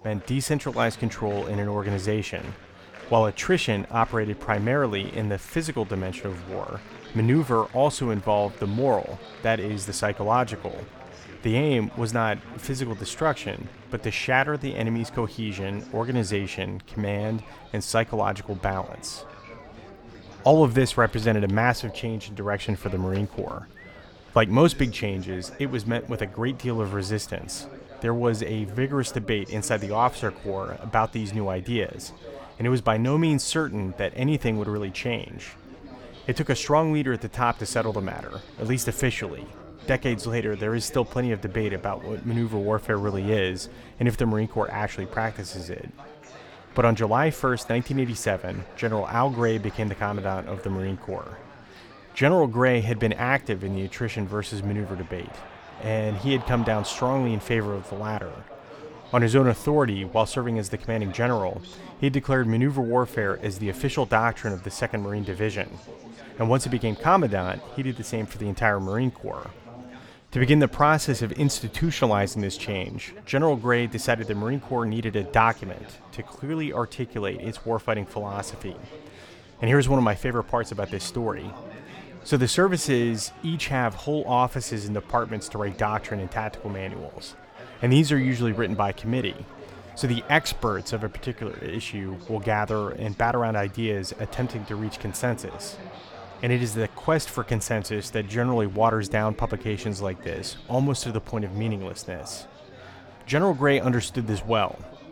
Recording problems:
chatter from many people; noticeable; throughout; 20 dB below the speech

